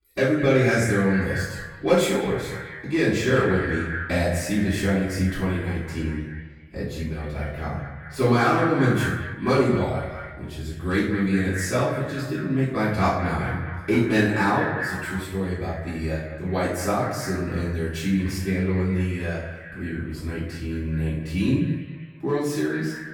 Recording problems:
echo of what is said; strong; throughout; 210 ms later, 10 dB below the speech
off-mic speech; far
room echo; noticeable; dies away in 0.7 s

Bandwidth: 17.5 kHz